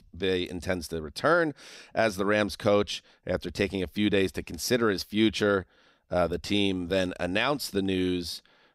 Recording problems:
none

